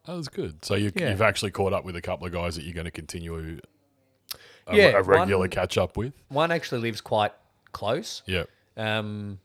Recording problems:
none

